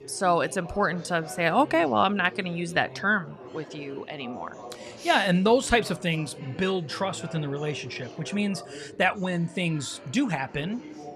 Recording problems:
chatter from many people; noticeable; throughout; 15 dB below the speech

